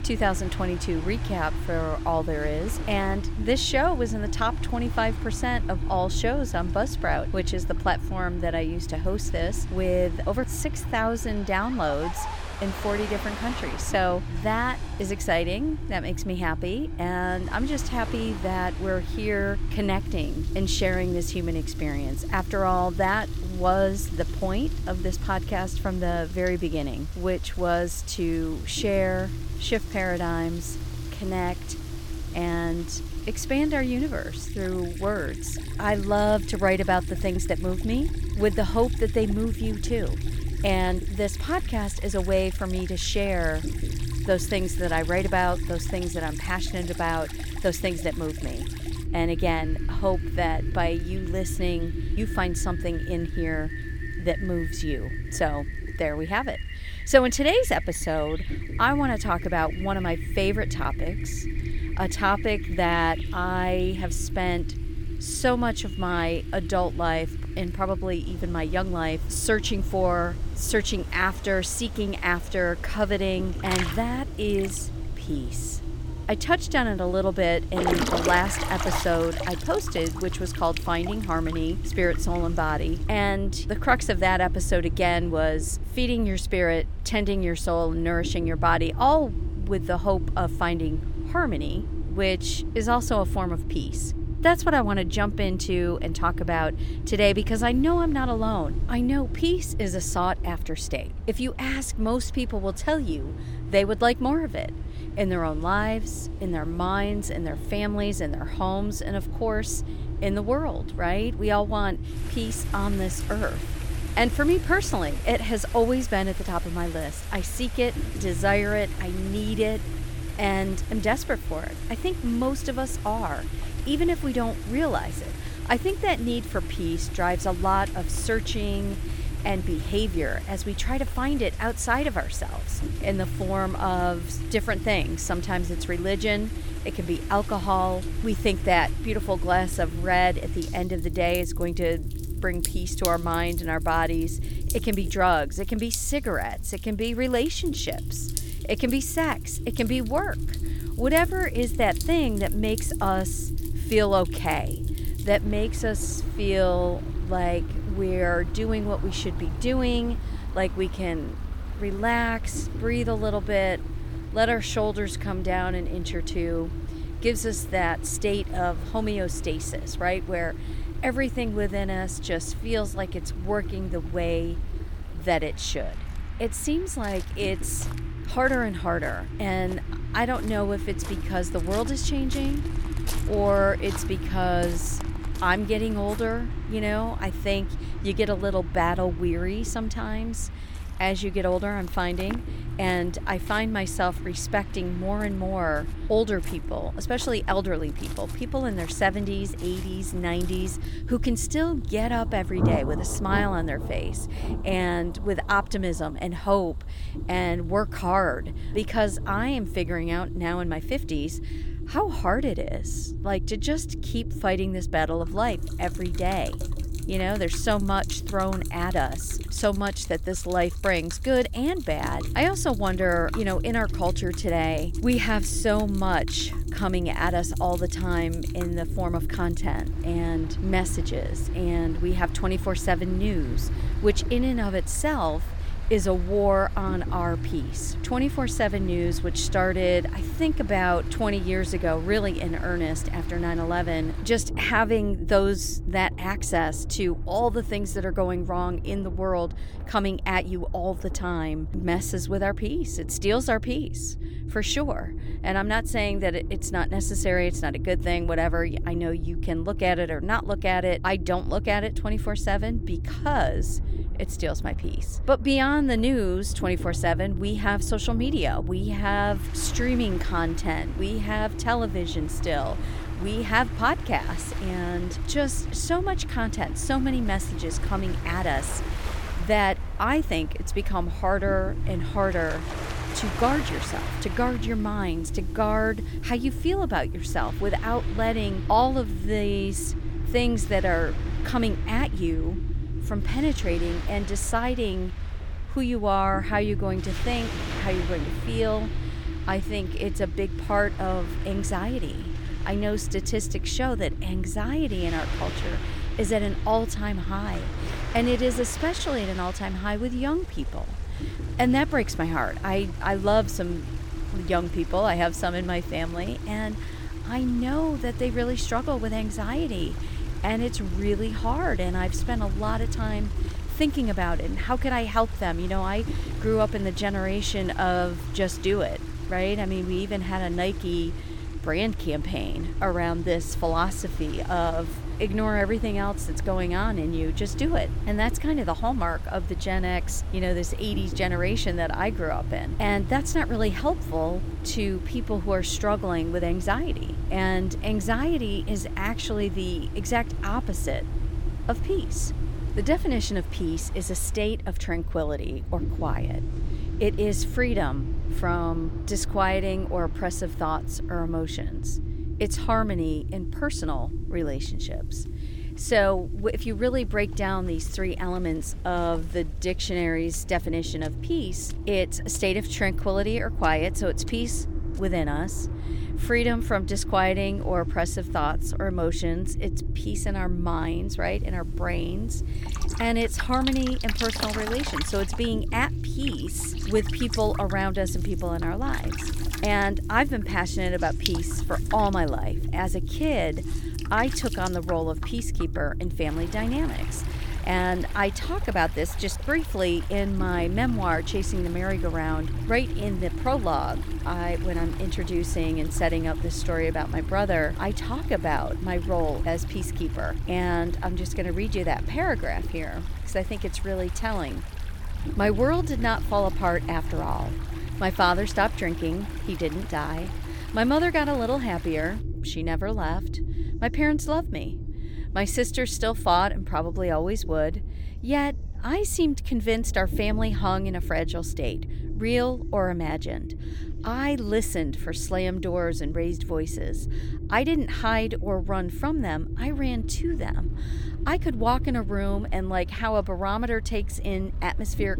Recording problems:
rain or running water; noticeable; throughout; 15 dB below the speech
low rumble; noticeable; throughout; 15 dB below the speech

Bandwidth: 17 kHz